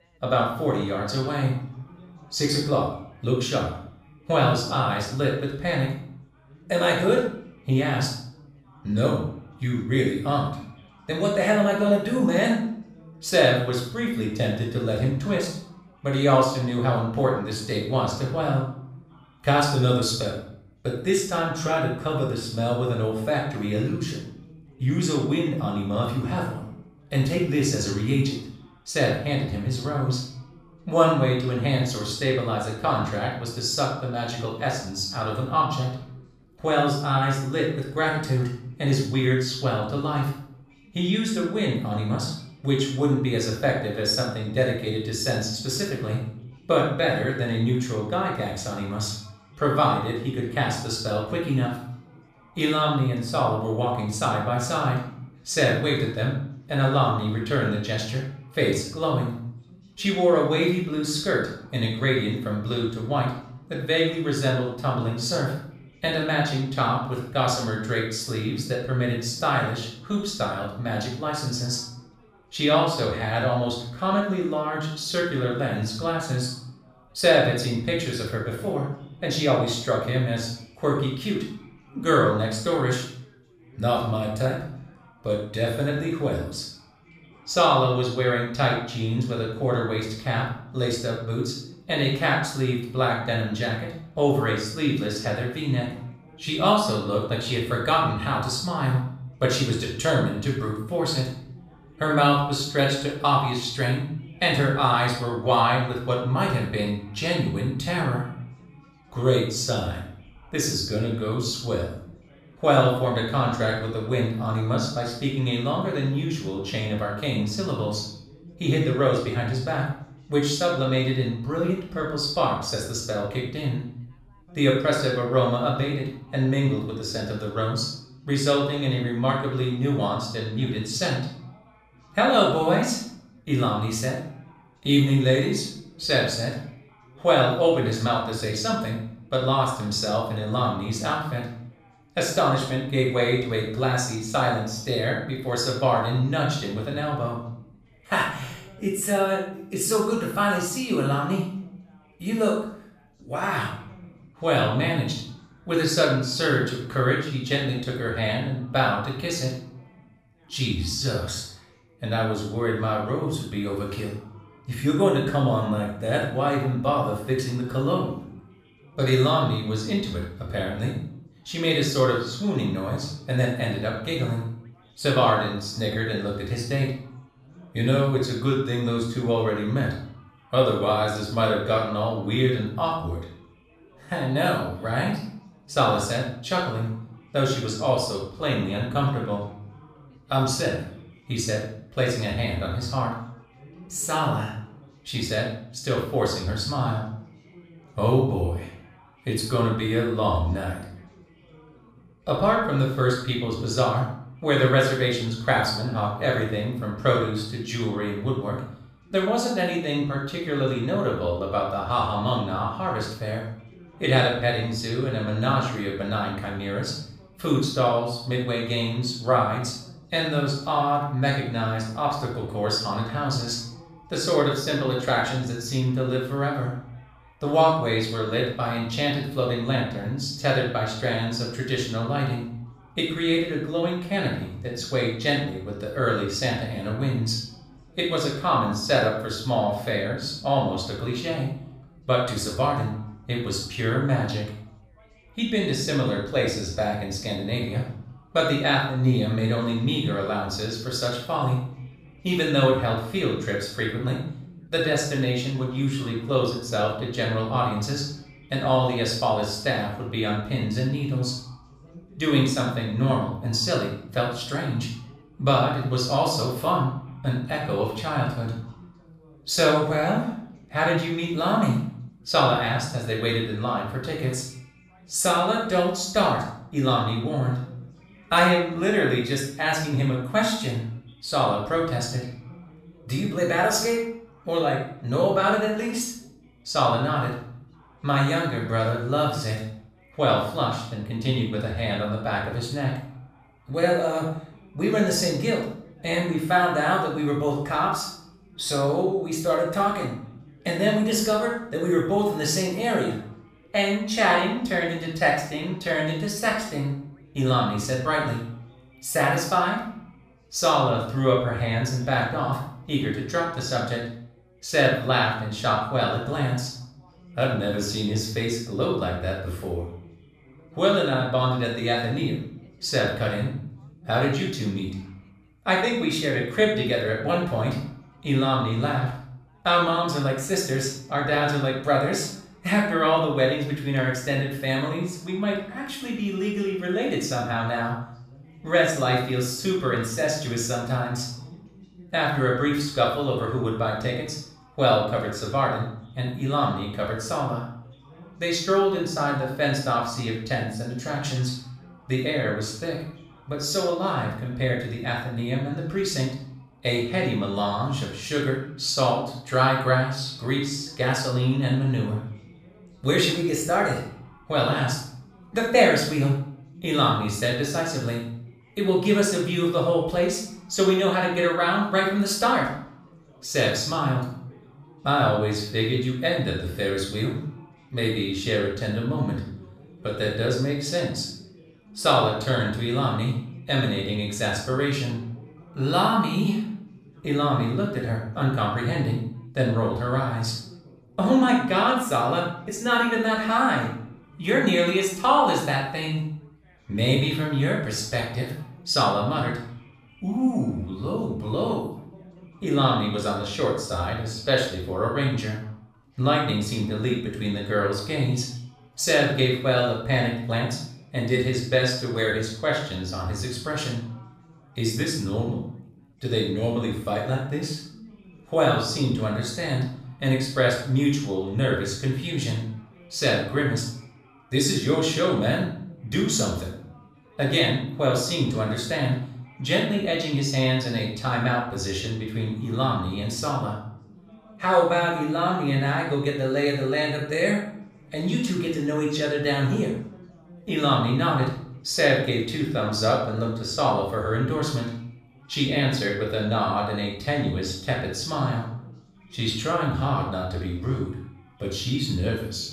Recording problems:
off-mic speech; far
room echo; noticeable; dies away in 0.5 s
background chatter; faint; throughout; 4 voices, 25 dB below the speech

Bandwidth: 15 kHz